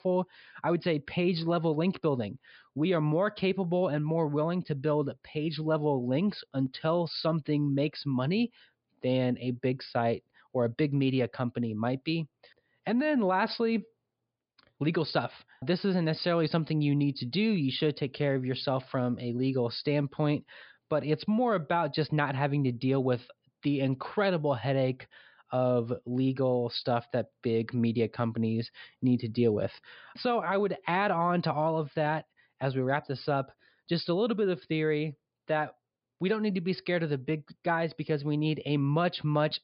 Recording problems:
high frequencies cut off; noticeable; nothing above 5 kHz

